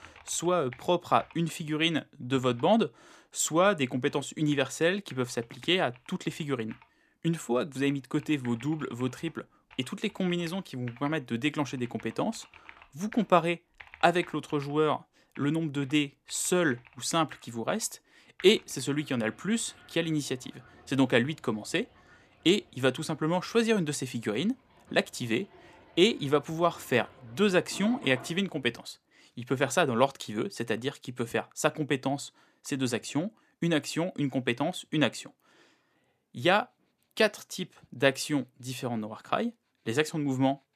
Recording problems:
household noises; faint; throughout; 25 dB below the speech

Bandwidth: 14.5 kHz